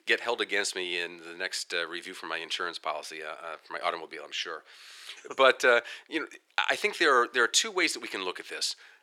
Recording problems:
thin; very; fading below 400 Hz

